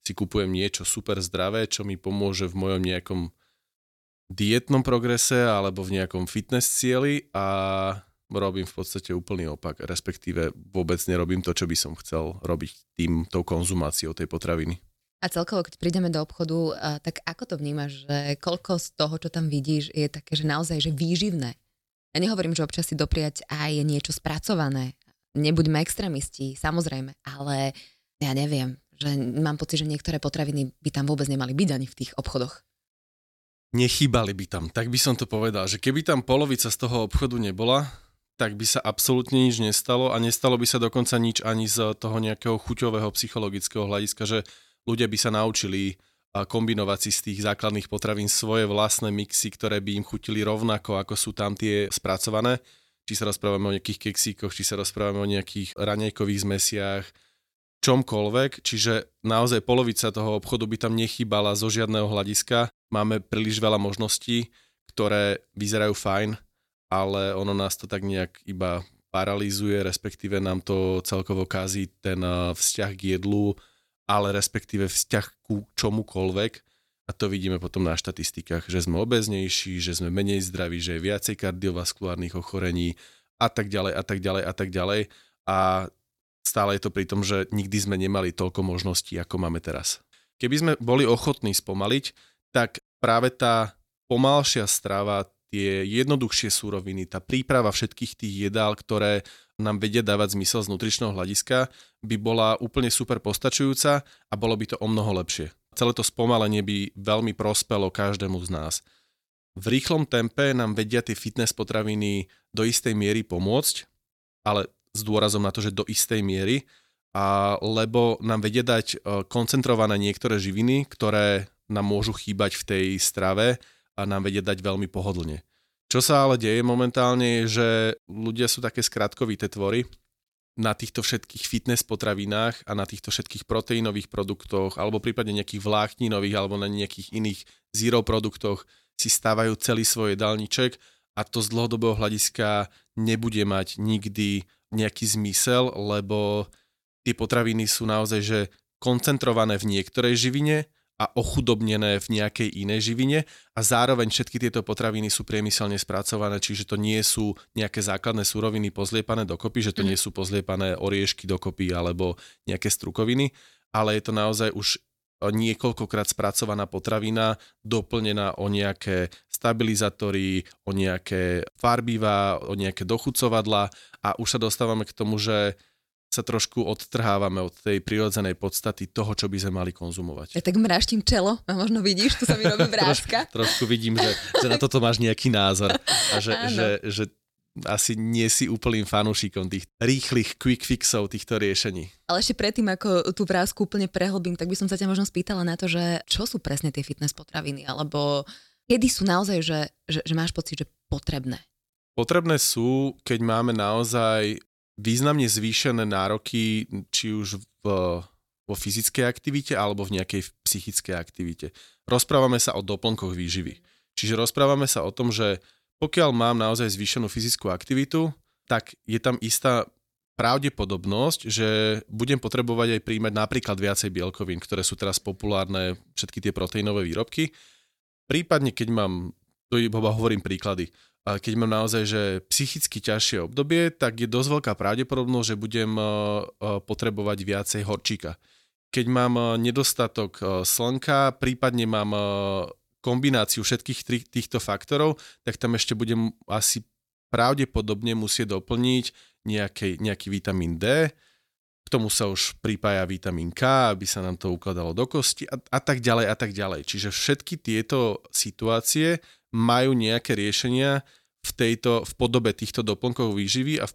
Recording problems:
none

